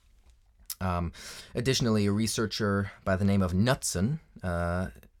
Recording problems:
none

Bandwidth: 17.5 kHz